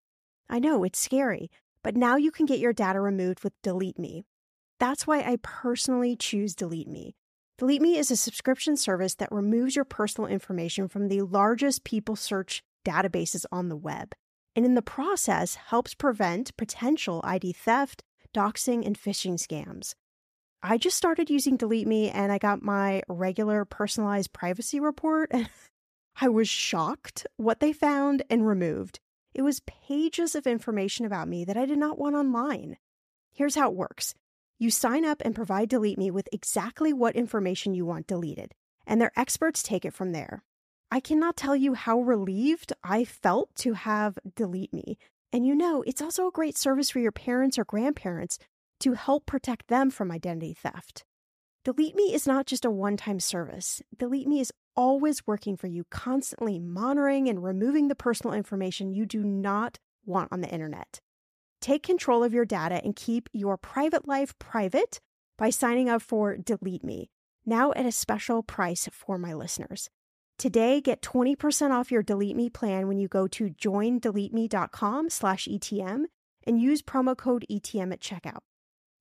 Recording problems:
none

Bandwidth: 14.5 kHz